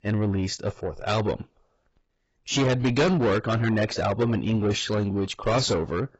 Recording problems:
distortion; heavy; 6 dB below the speech
garbled, watery; badly; nothing above 7.5 kHz

